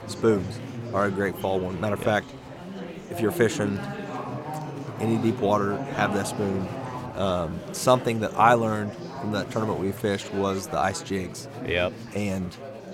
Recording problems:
chatter from many people; loud; throughout; 9 dB below the speech

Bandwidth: 16.5 kHz